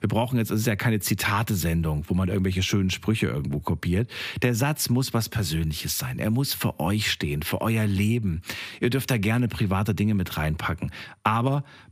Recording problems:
squashed, flat; somewhat

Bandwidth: 15 kHz